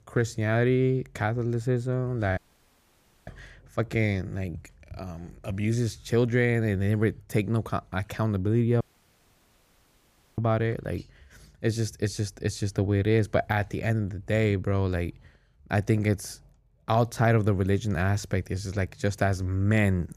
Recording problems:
audio cutting out; at 2.5 s for 1 s and at 9 s for 1.5 s

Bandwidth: 15 kHz